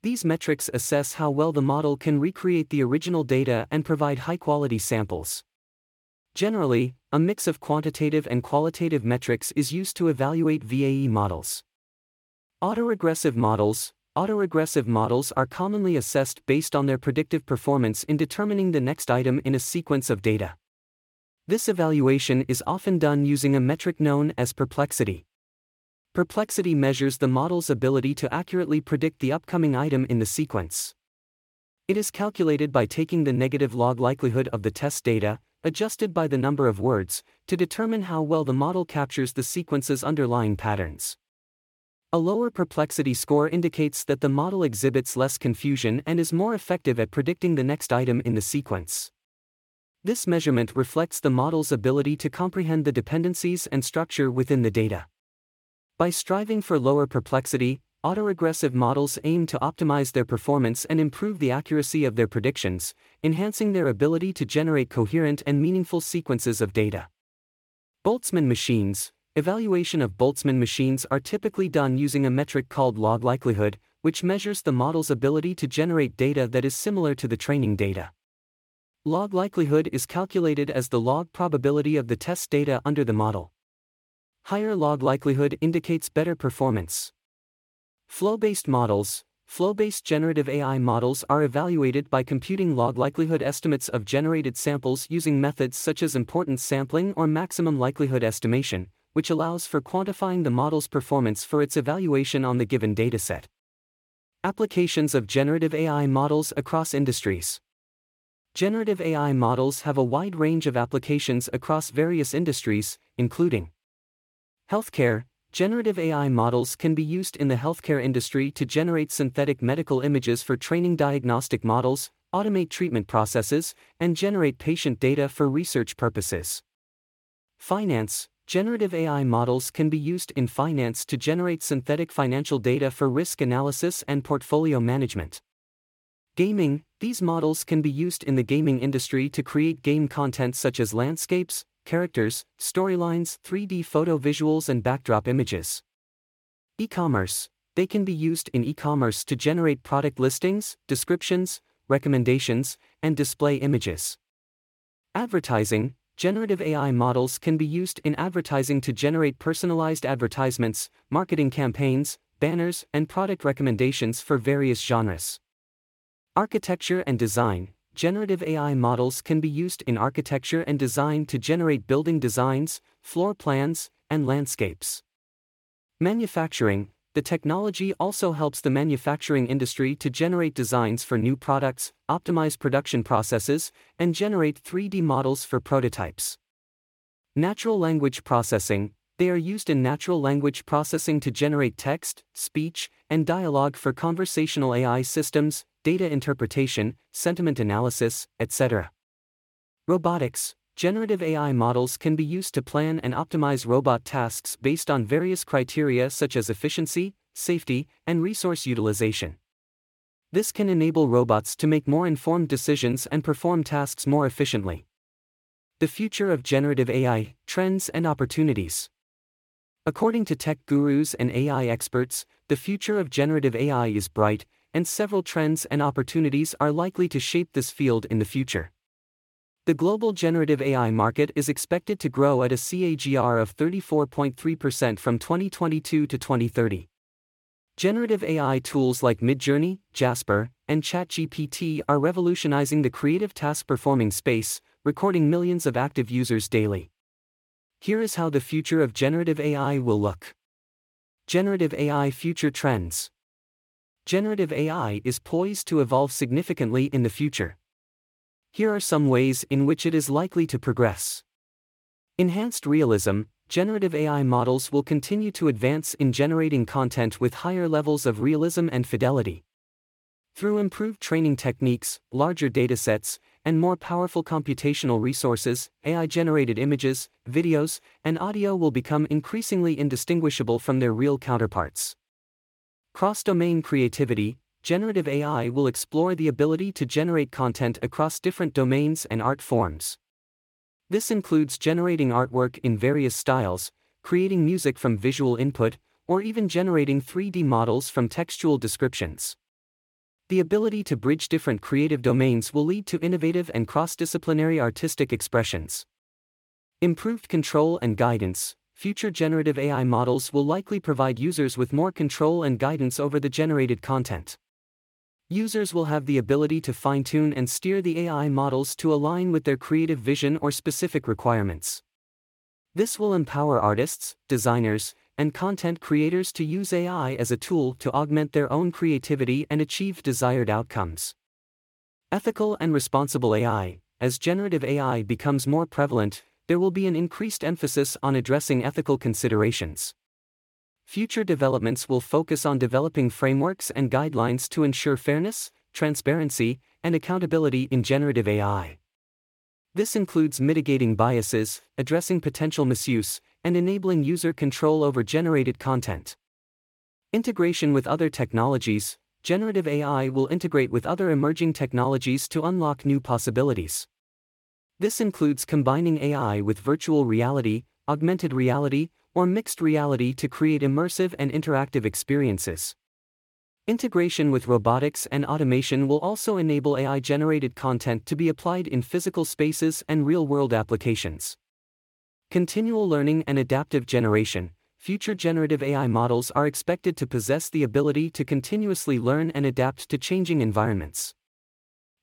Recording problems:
none

